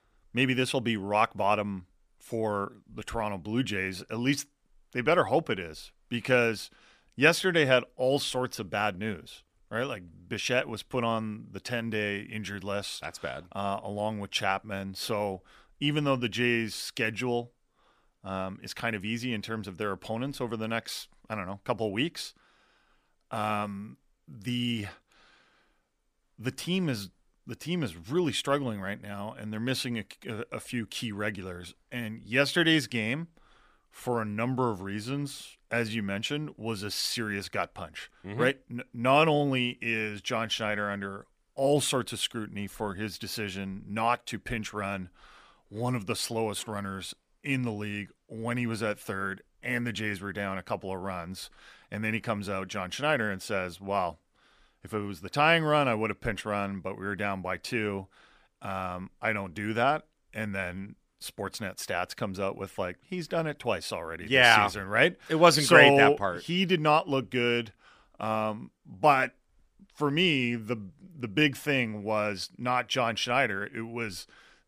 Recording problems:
none

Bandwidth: 15 kHz